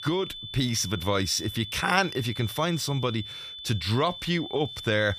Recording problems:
high-pitched whine; loud; throughout; 3.5 kHz, 10 dB below the speech

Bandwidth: 15 kHz